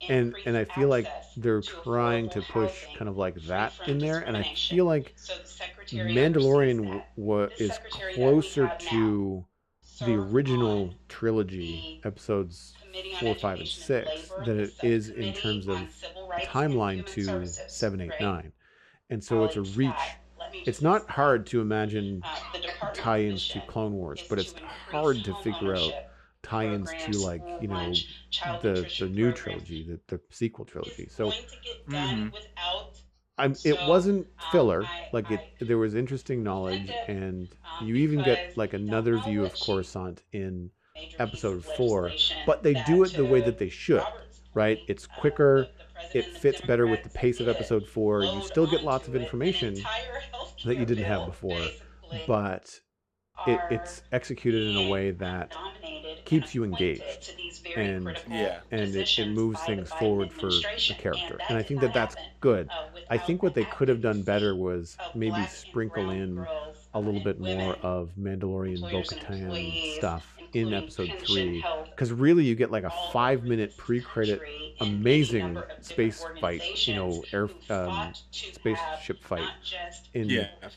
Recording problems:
voice in the background; loud; throughout; 6 dB below the speech

